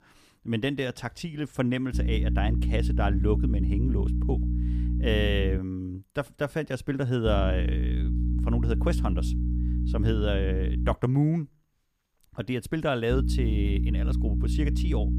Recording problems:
electrical hum; loud; from 2 to 5.5 s, from 7.5 to 11 s and from 13 s on; 60 Hz, 8 dB below the speech

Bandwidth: 15 kHz